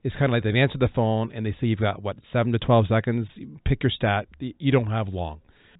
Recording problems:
high frequencies cut off; severe; nothing above 4 kHz

